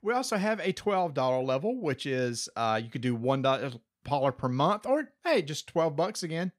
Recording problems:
none

